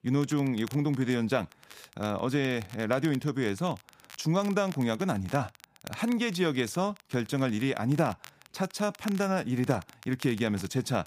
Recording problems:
crackle, like an old record; faint; 20 dB below the speech

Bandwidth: 15 kHz